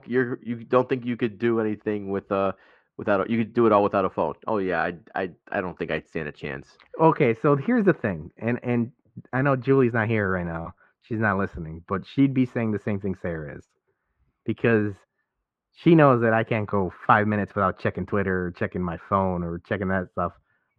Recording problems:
muffled; very; fading above 1.5 kHz

